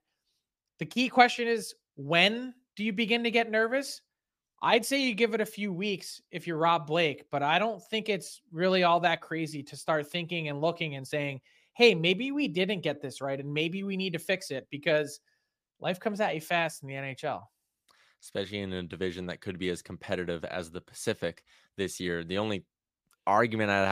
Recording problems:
abrupt cut into speech; at the end

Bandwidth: 15 kHz